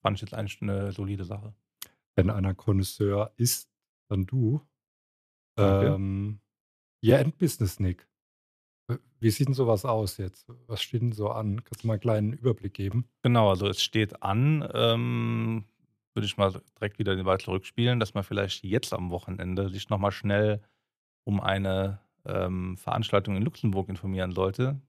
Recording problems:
none

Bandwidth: 14.5 kHz